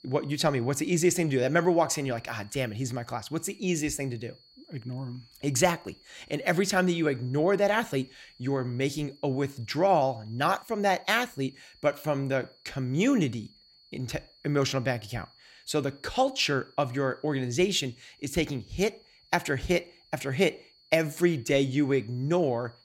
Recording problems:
high-pitched whine; faint; throughout; 4.5 kHz, 30 dB below the speech

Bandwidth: 16 kHz